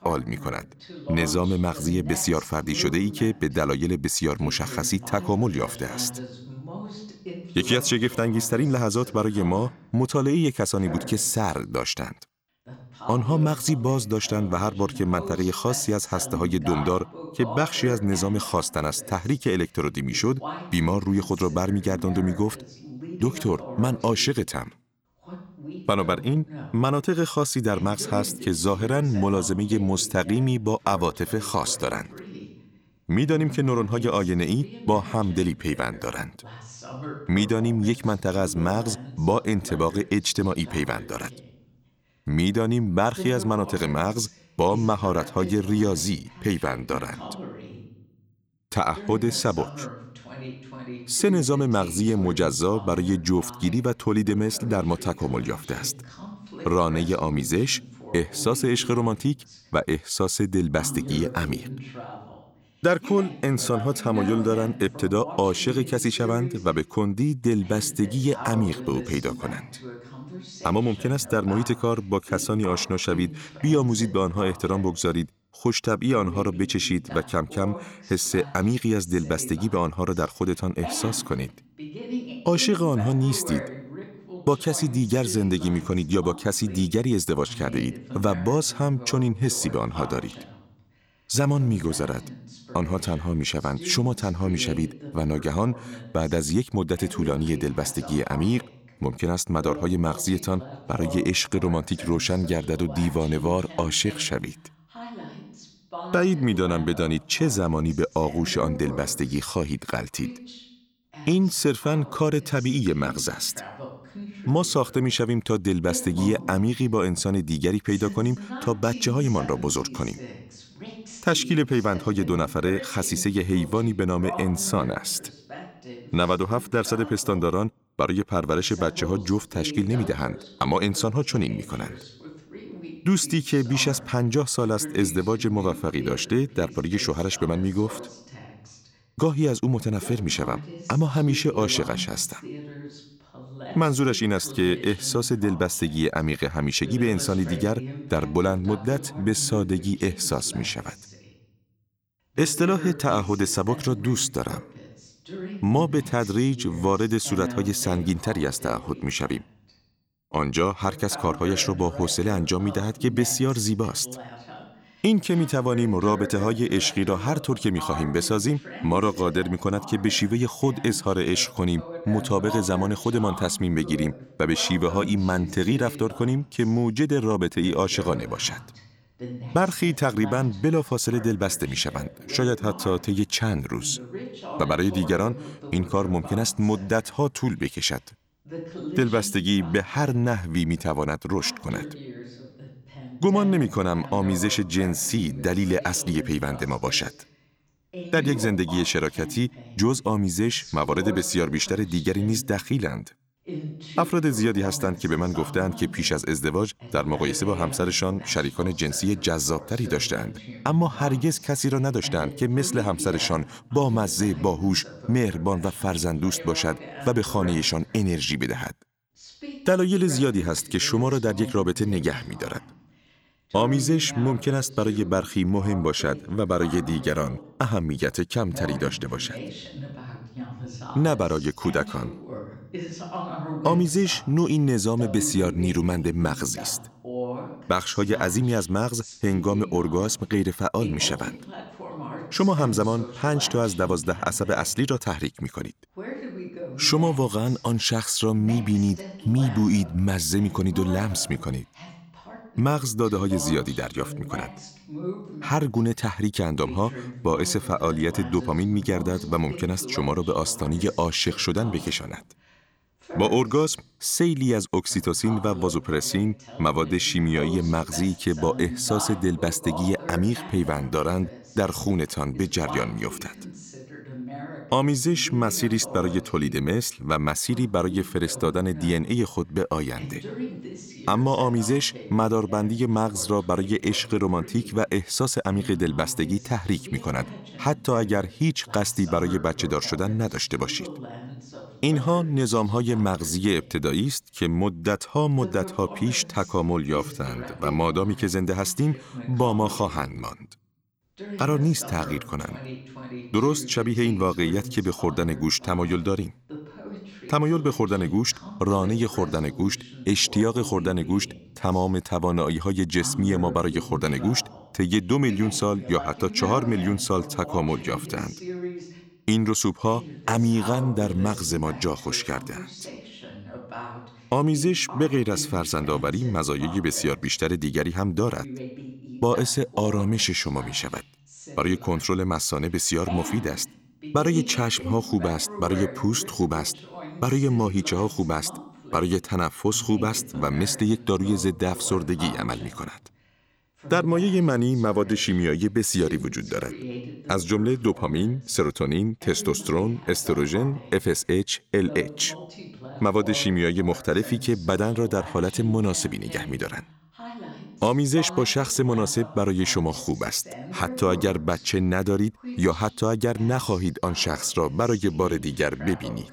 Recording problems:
voice in the background; noticeable; throughout; 15 dB below the speech

